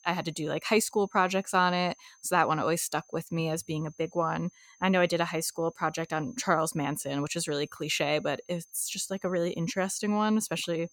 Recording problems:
high-pitched whine; faint; throughout; 6.5 kHz, 30 dB below the speech

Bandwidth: 17.5 kHz